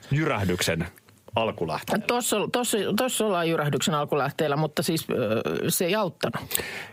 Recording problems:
squashed, flat; heavily

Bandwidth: 15.5 kHz